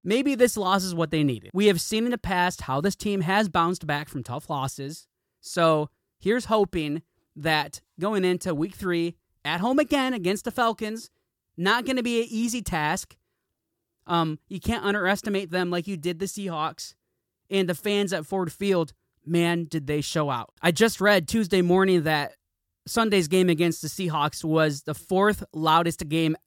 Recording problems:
none

